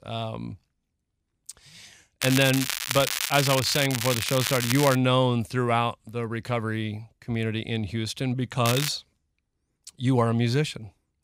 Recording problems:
crackling; loud; from 2 to 5 s and at 8.5 s; 3 dB below the speech

